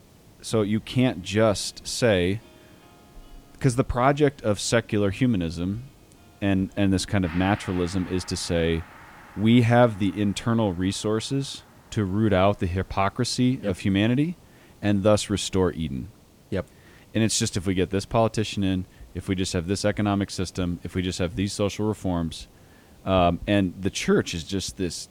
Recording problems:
background music; faint; throughout; 25 dB below the speech
hiss; faint; throughout; 30 dB below the speech

